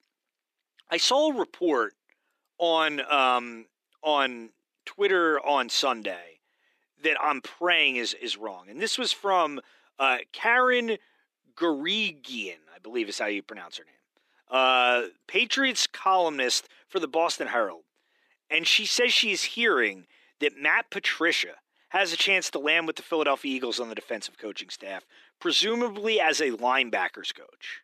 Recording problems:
thin; somewhat; fading below 300 Hz

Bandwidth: 14.5 kHz